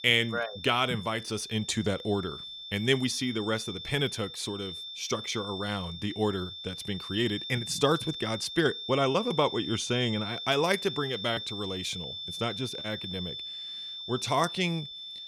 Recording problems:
high-pitched whine; loud; throughout; 3.5 kHz, 7 dB below the speech

